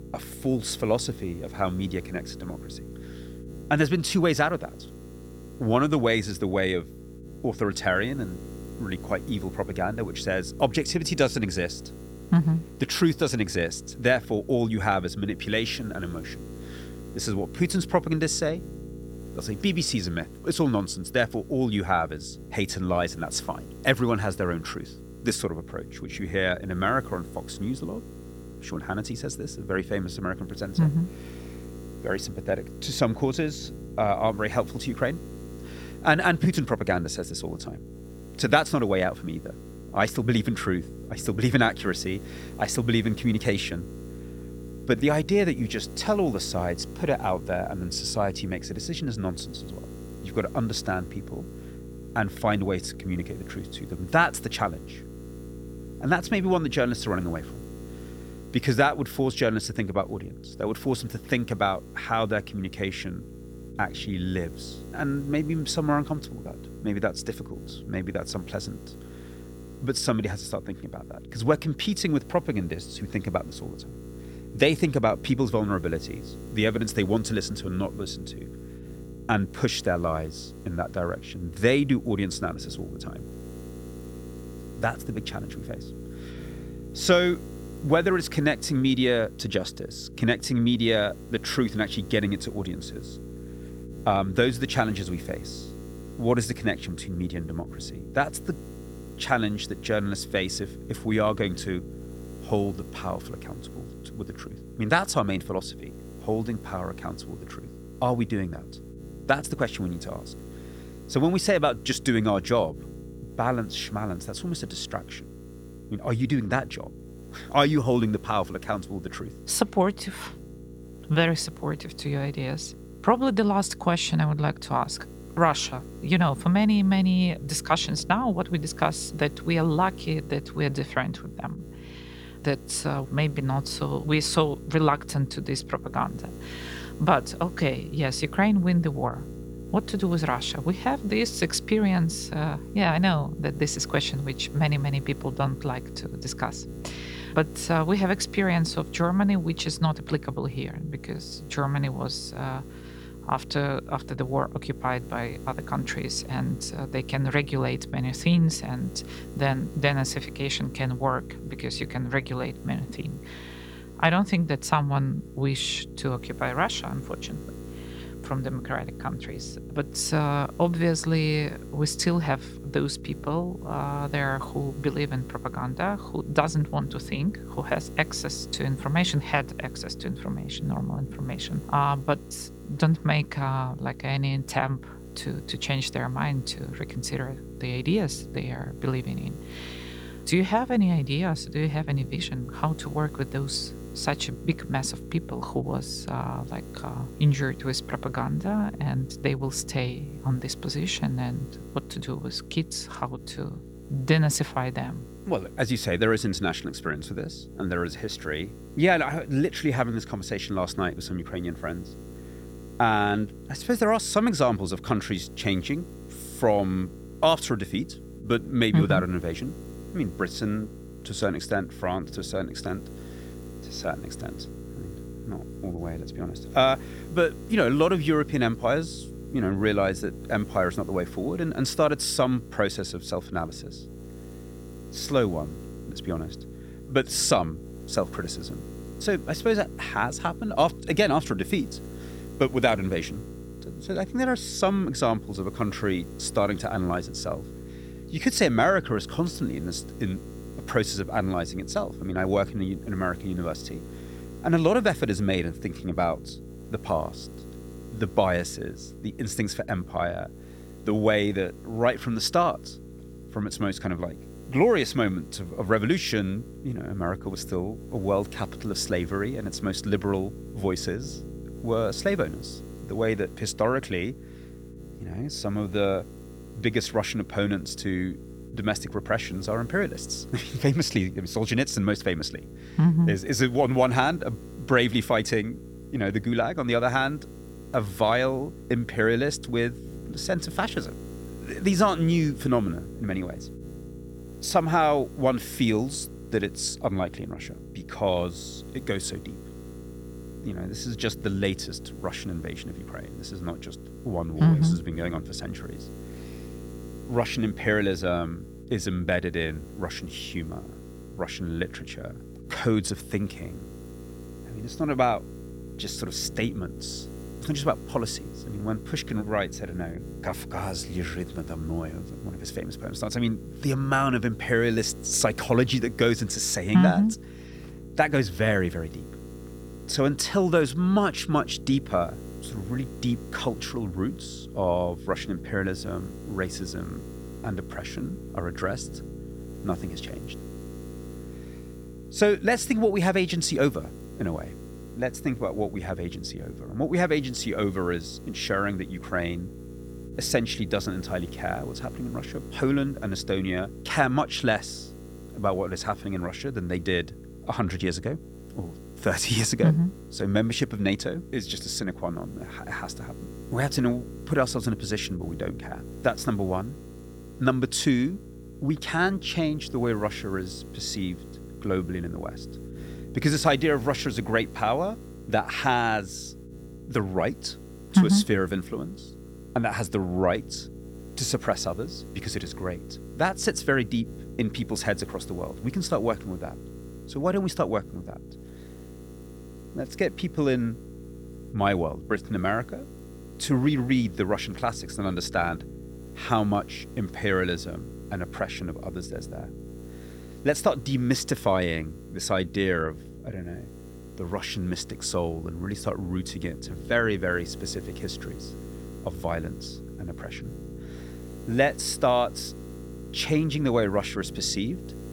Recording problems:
electrical hum; noticeable; throughout; 60 Hz, 20 dB below the speech

